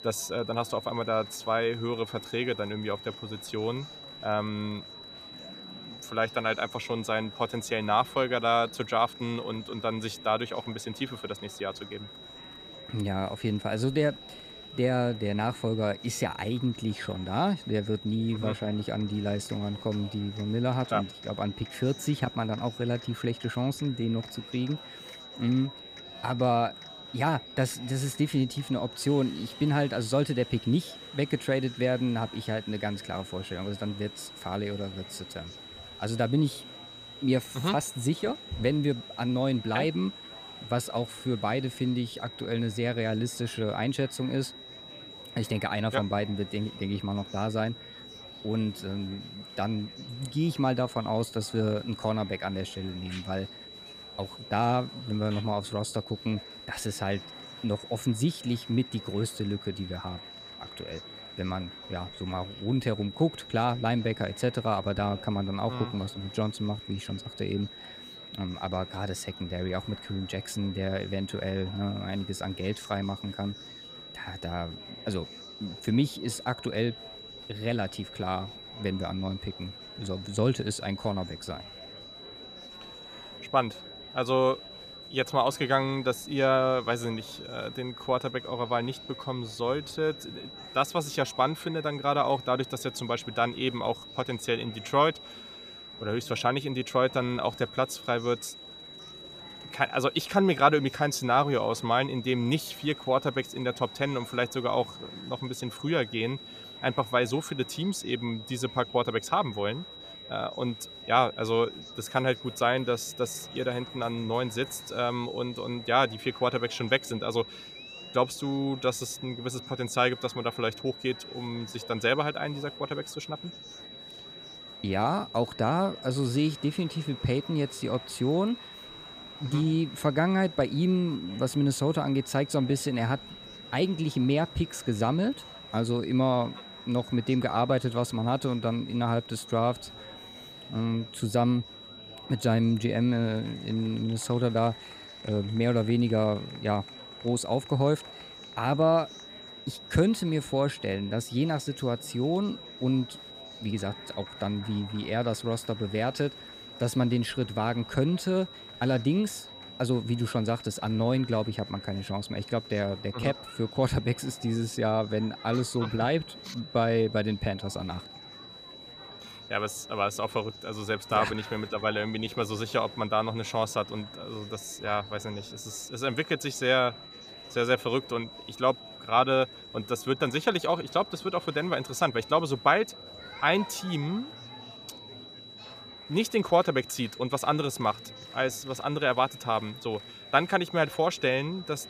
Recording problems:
high-pitched whine; noticeable; throughout; 4 kHz, 15 dB below the speech
murmuring crowd; faint; throughout; 20 dB below the speech

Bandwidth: 14.5 kHz